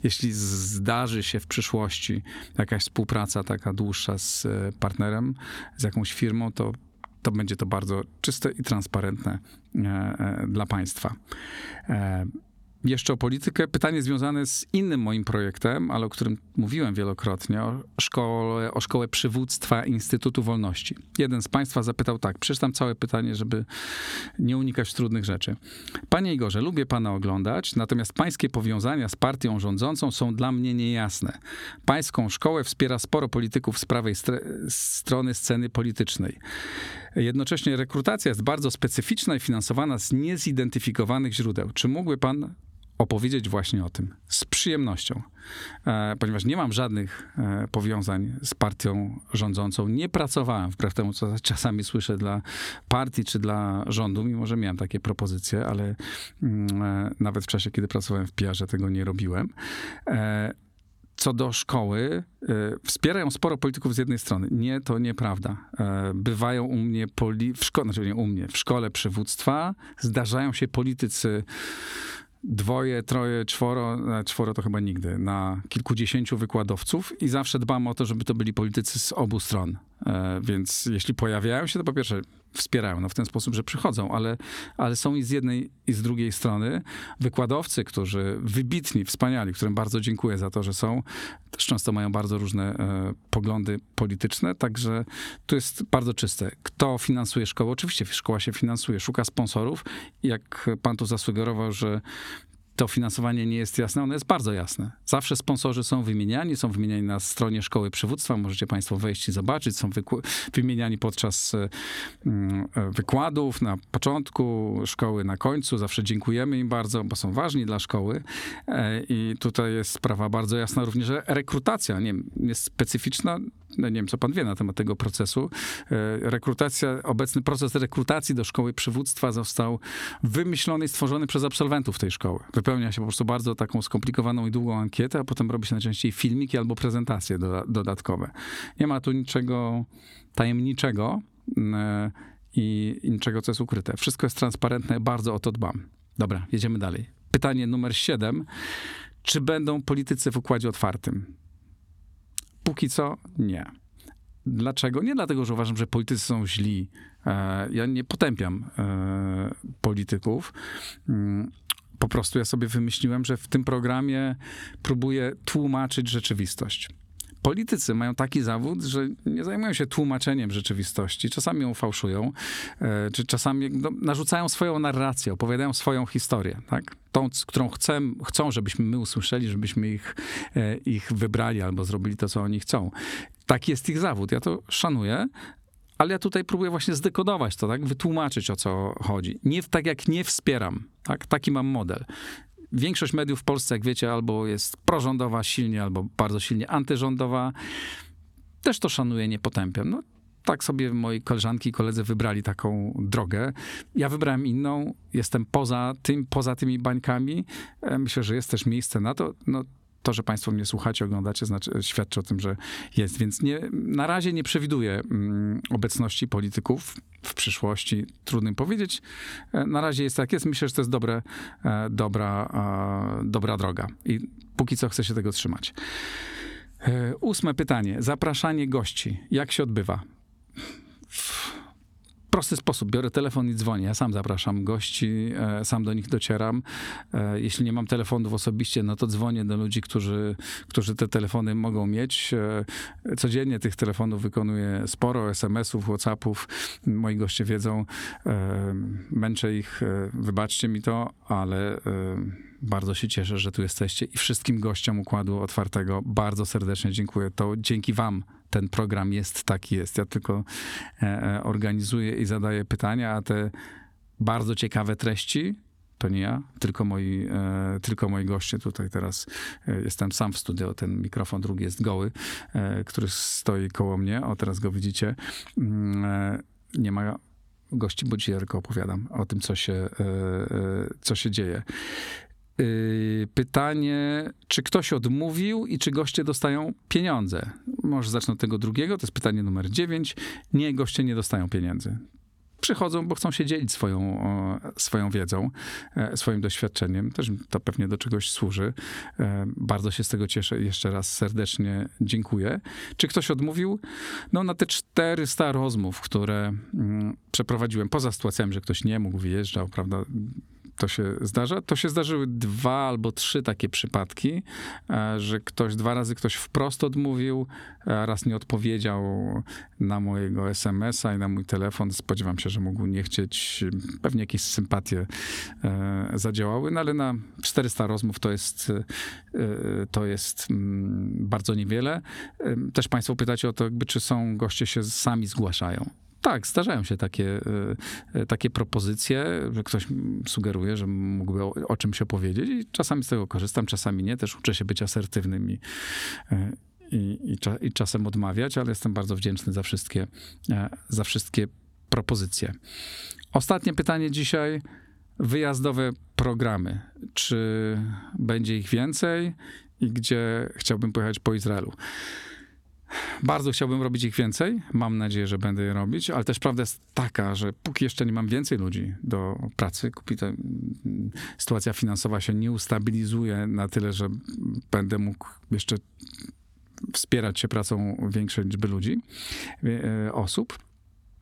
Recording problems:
squashed, flat; somewhat

